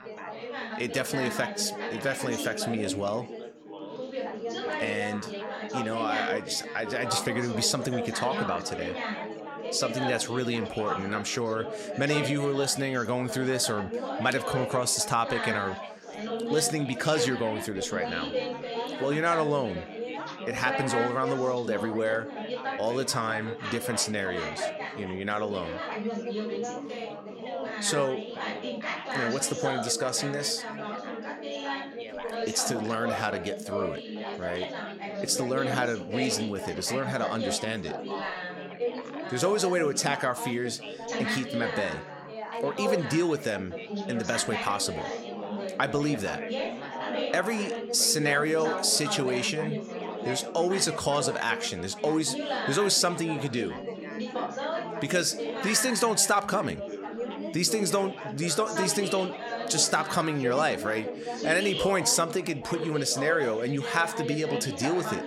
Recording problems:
chatter from many people; loud; throughout; 6 dB below the speech

